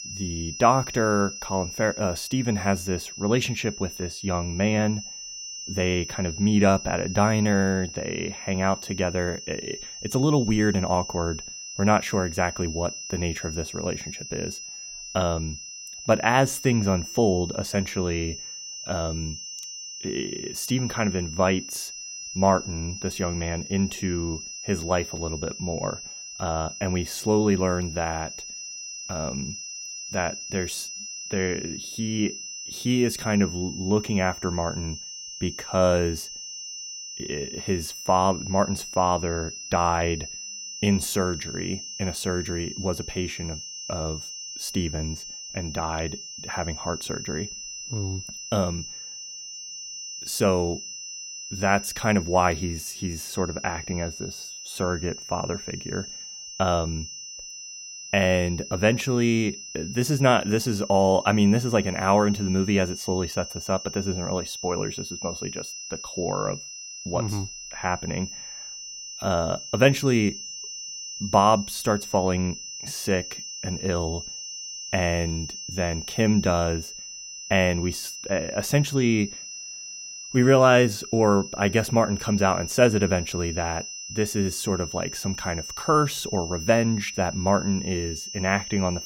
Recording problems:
high-pitched whine; loud; throughout; 6 kHz, 9 dB below the speech

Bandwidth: 16 kHz